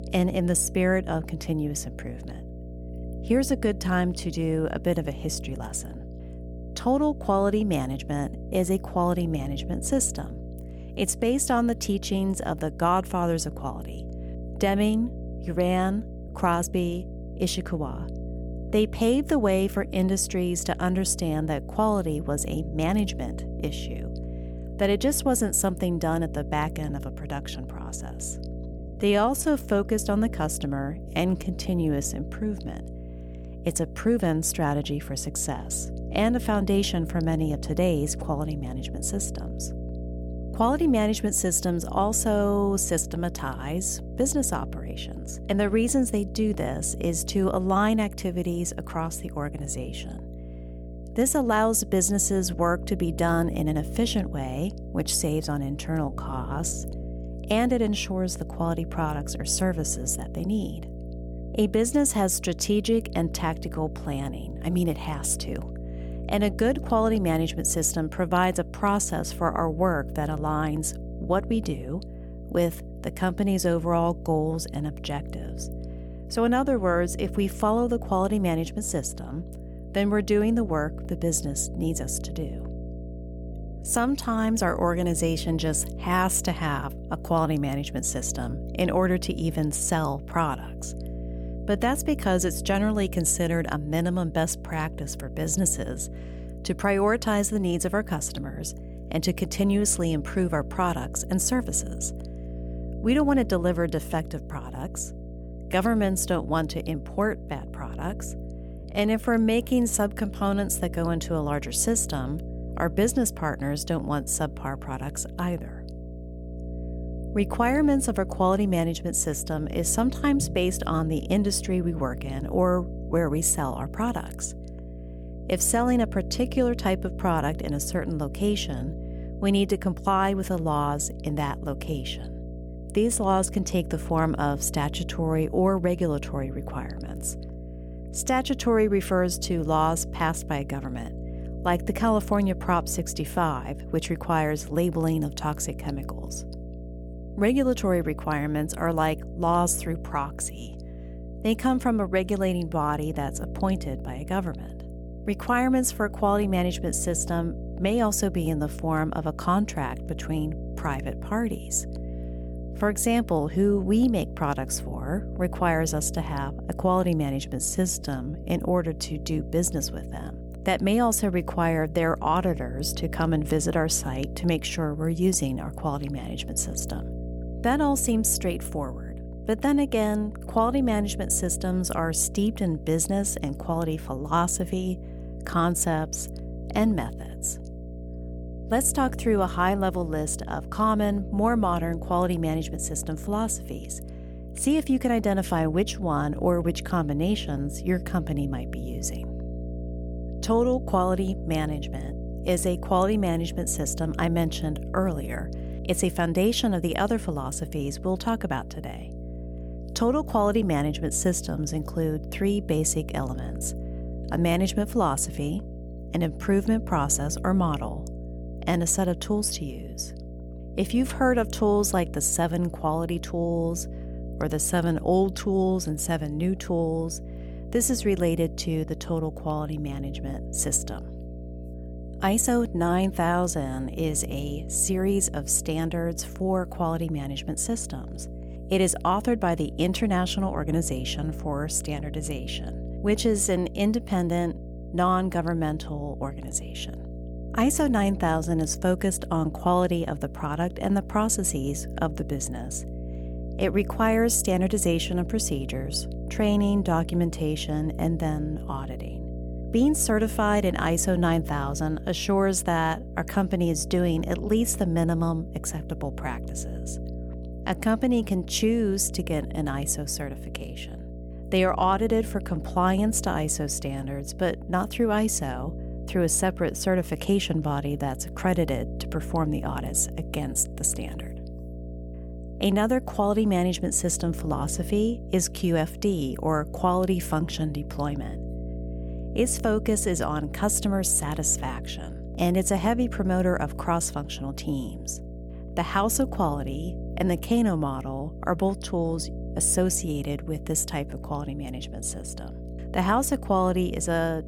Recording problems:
electrical hum; noticeable; throughout; 60 Hz, 15 dB below the speech
uneven, jittery; strongly; from 16 s to 2:48

